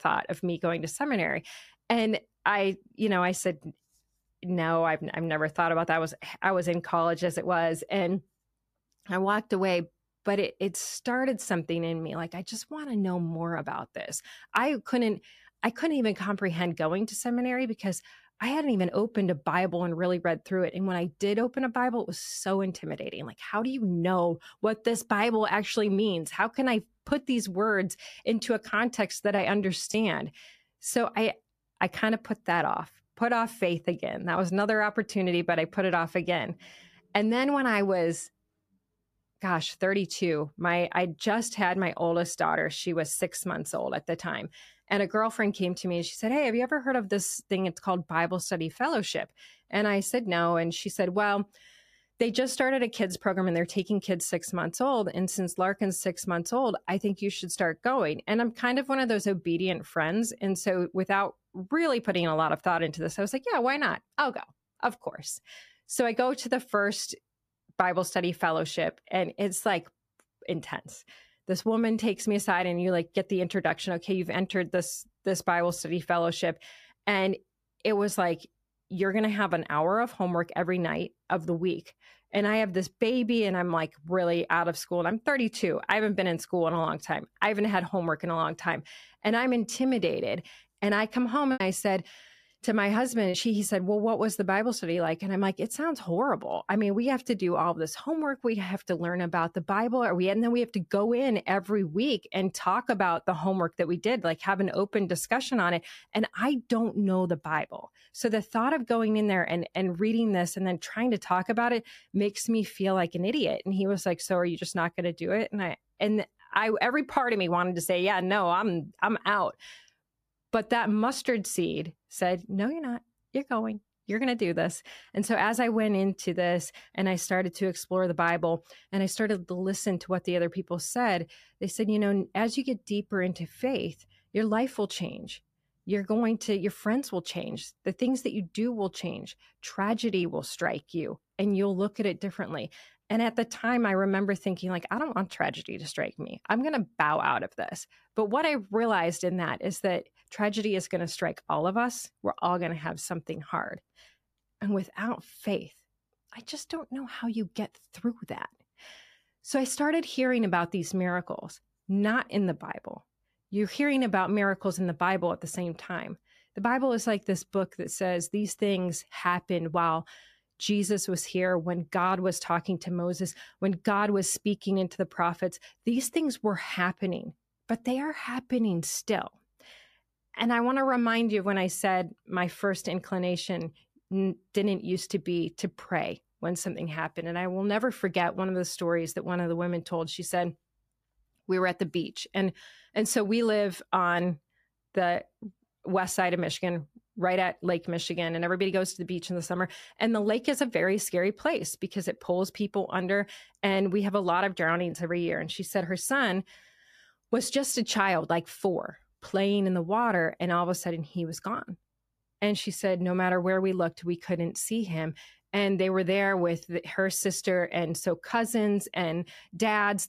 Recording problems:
choppy; occasionally; from 1:32 to 1:33; 4% of the speech affected

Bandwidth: 14.5 kHz